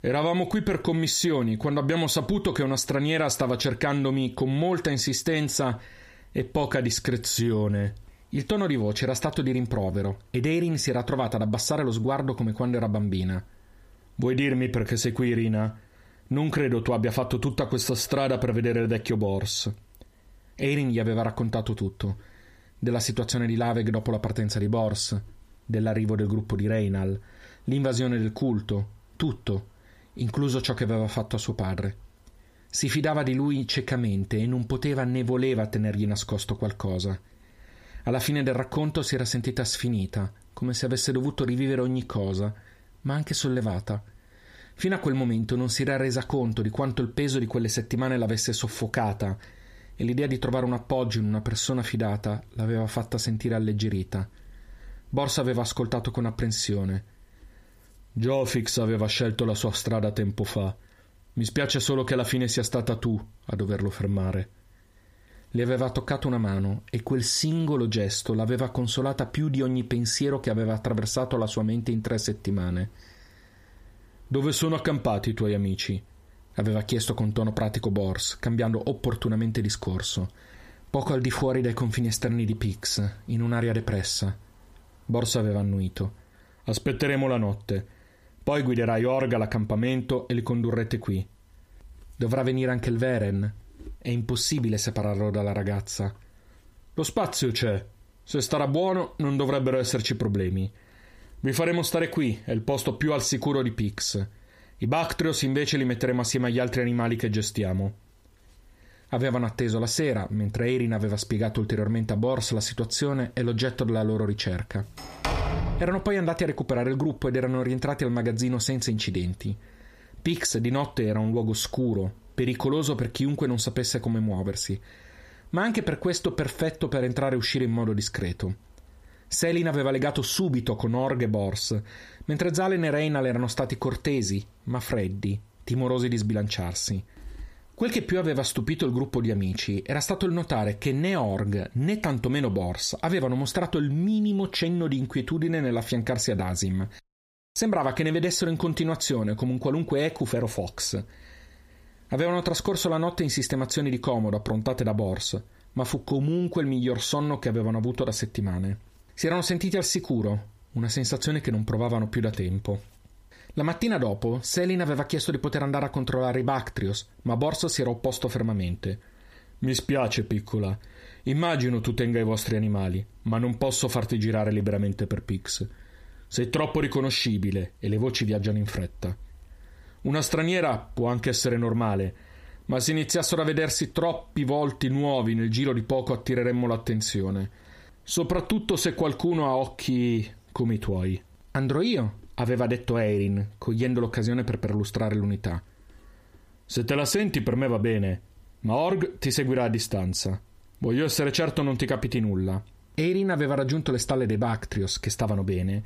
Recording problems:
squashed, flat; heavily
door banging; noticeable; from 1:55 to 1:56; peak 1 dB below the speech

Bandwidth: 15 kHz